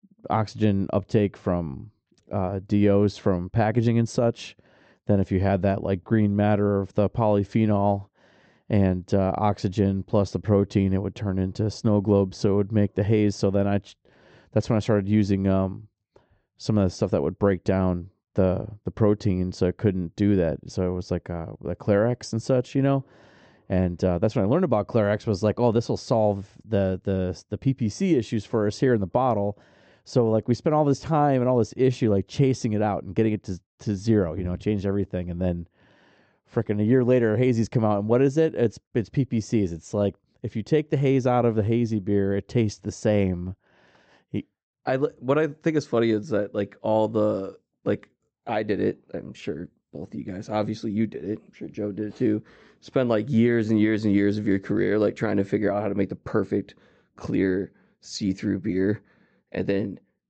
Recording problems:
high frequencies cut off; noticeable; nothing above 8 kHz
muffled; very slightly; fading above 1.5 kHz

